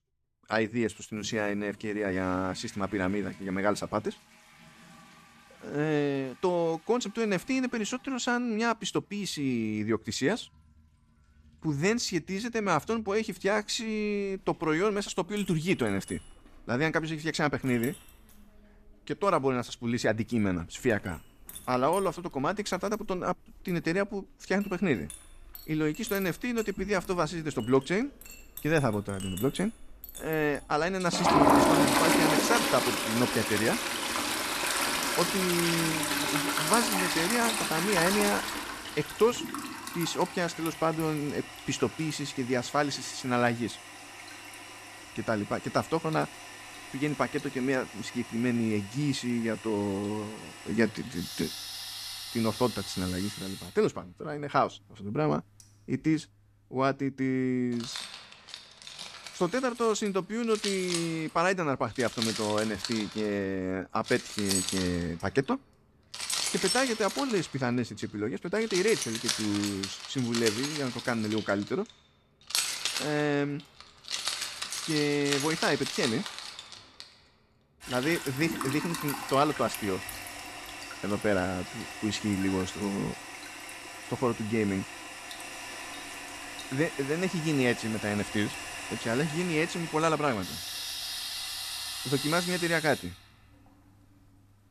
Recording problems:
household noises; loud; throughout; 3 dB below the speech

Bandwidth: 14.5 kHz